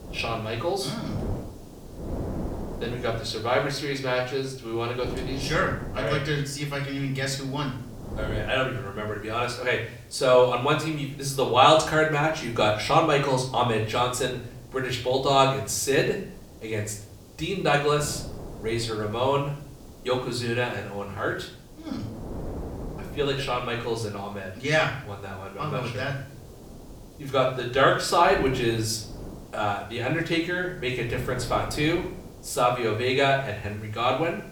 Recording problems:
off-mic speech; far
room echo; slight; dies away in 0.5 s
wind noise on the microphone; occasional gusts; 20 dB below the speech
hiss; faint; throughout; 30 dB below the speech

